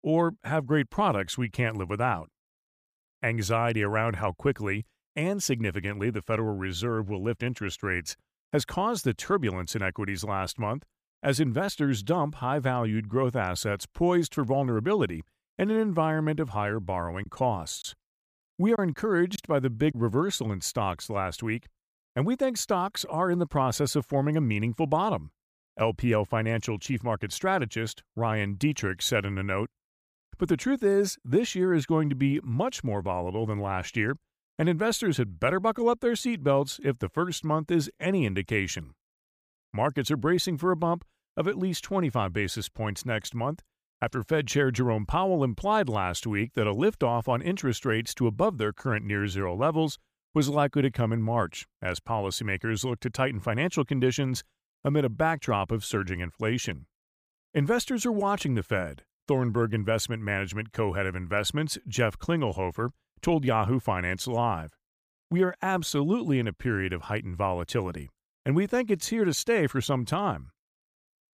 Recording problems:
choppy; very; from 17 to 20 s; 5% of the speech affected

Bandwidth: 15 kHz